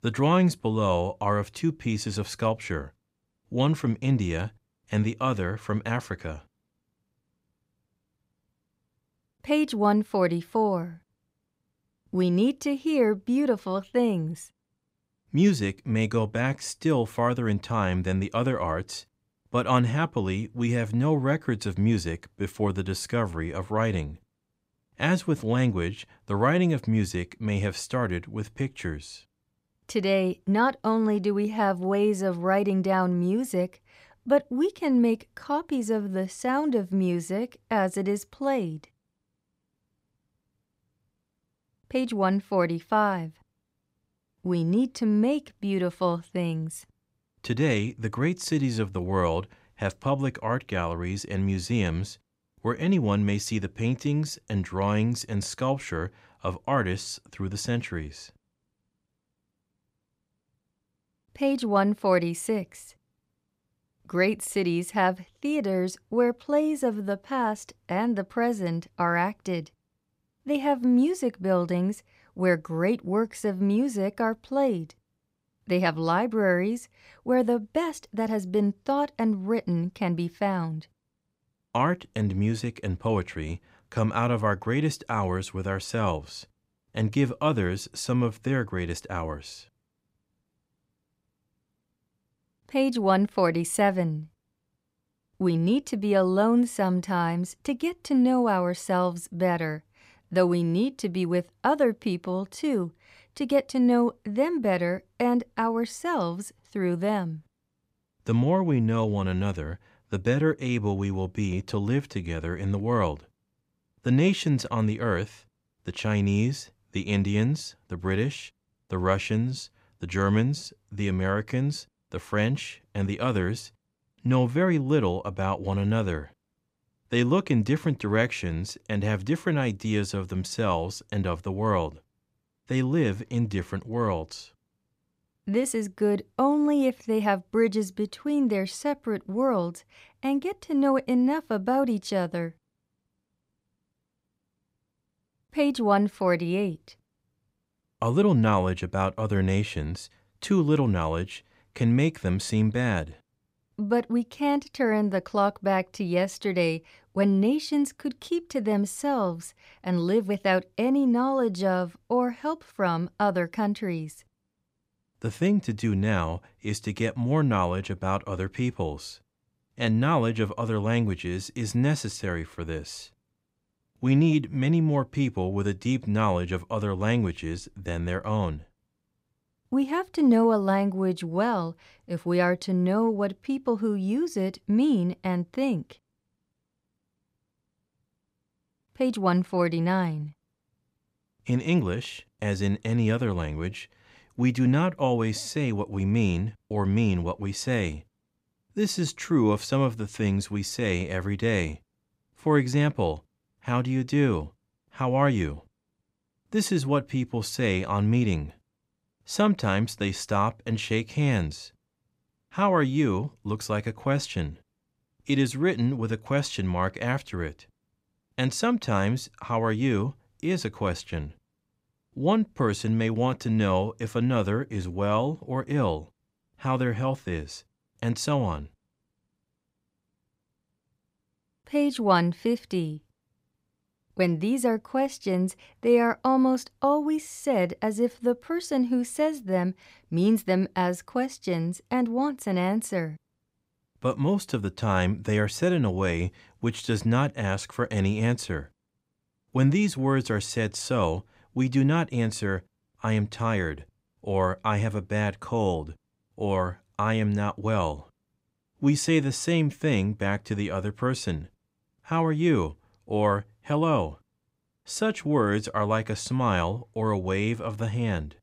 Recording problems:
none

